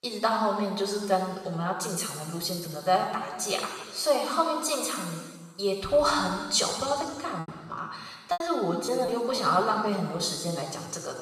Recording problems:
room echo; strong; dies away in 1.5 s
off-mic speech; far
thin; very slightly; fading below 500 Hz
choppy; very; from 7.5 to 9.5 s; 11% of the speech affected

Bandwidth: 14 kHz